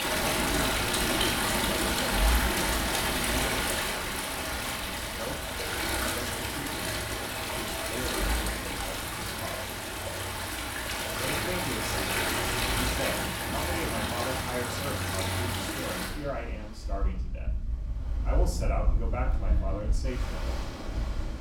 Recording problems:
off-mic speech; far
room echo; slight; dies away in 0.4 s
rain or running water; very loud; throughout; 10 dB above the speech

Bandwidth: 17.5 kHz